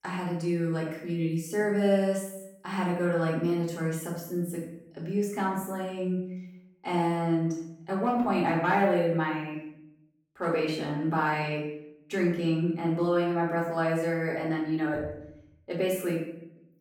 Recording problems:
off-mic speech; far
room echo; noticeable; dies away in 0.7 s

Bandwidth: 17.5 kHz